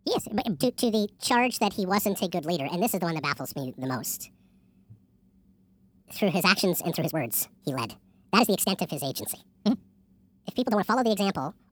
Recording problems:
wrong speed and pitch; too fast and too high; 1.6 times normal speed
uneven, jittery; strongly; from 0.5 to 11 s

